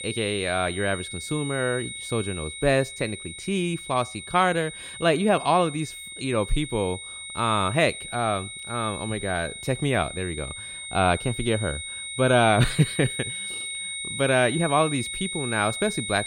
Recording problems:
high-pitched whine; loud; throughout; 2 kHz, 8 dB below the speech

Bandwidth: 16.5 kHz